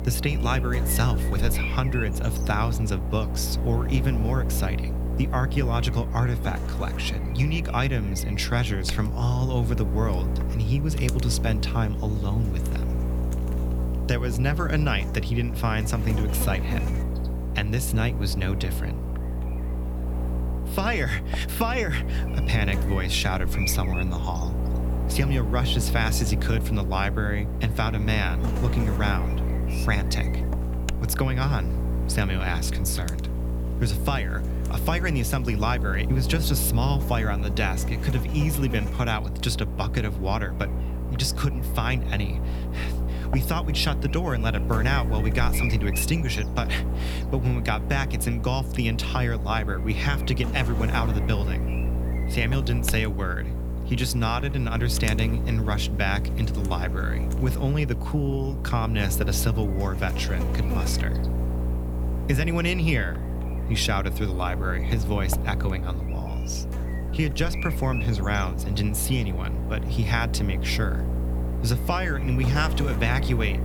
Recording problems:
electrical hum; loud; throughout; 60 Hz, 8 dB below the speech

